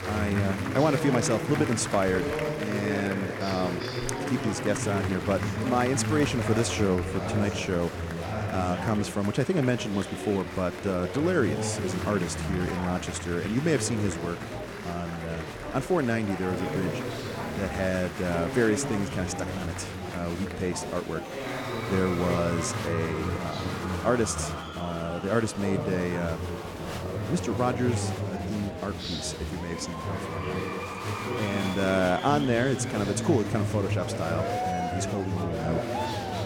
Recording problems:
murmuring crowd; loud; throughout; 3 dB below the speech
rain or running water; faint; throughout; 25 dB below the speech

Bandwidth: 18 kHz